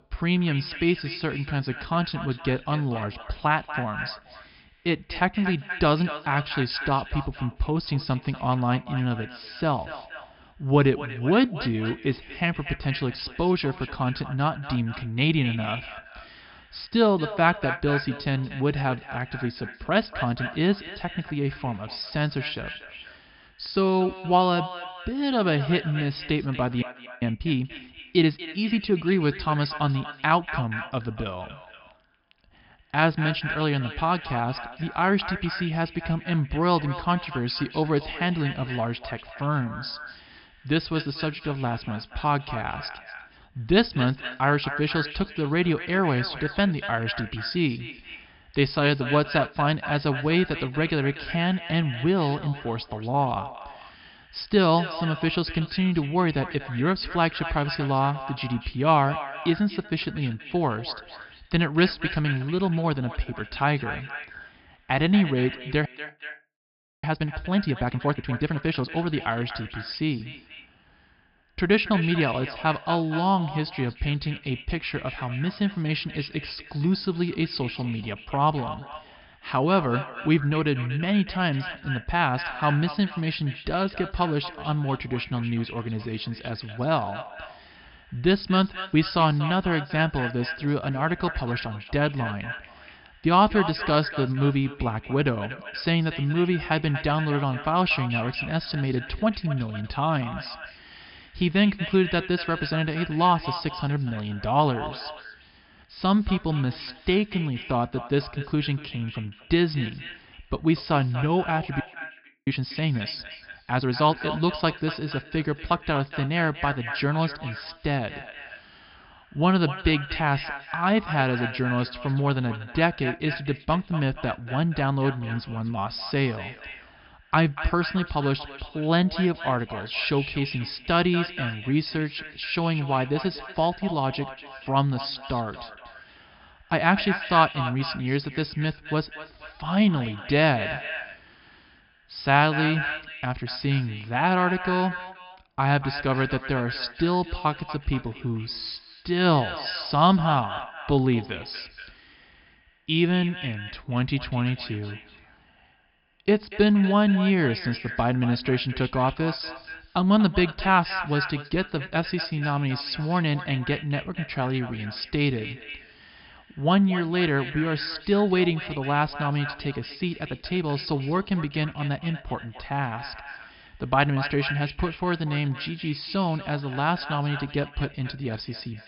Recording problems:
echo of what is said; strong; throughout; 240 ms later, 10 dB below the speech
high frequencies cut off; noticeable; nothing above 5.5 kHz
audio freezing; at 27 s, at 1:06 for 1 s and at 1:52 for 0.5 s

